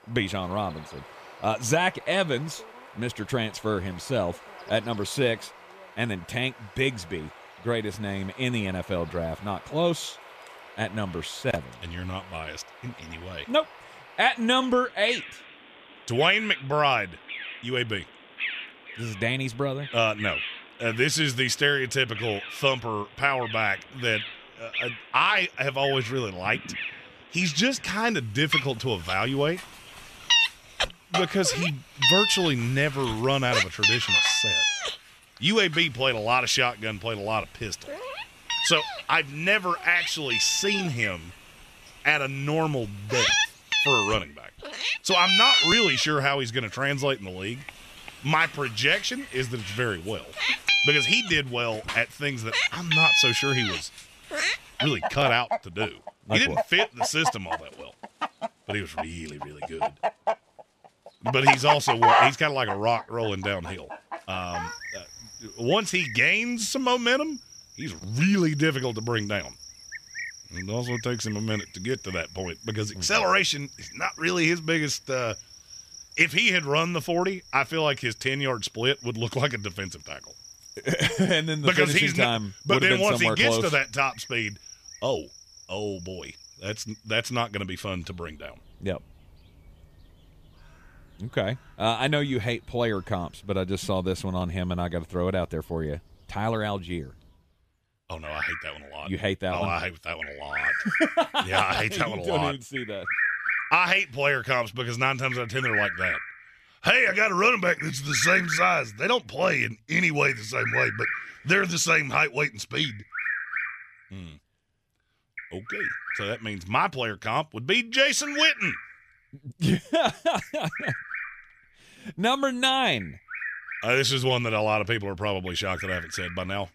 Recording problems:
animal sounds; loud; throughout; 2 dB below the speech

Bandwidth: 14.5 kHz